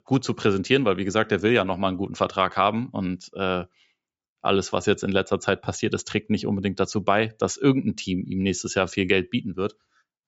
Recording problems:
high frequencies cut off; noticeable; nothing above 8 kHz

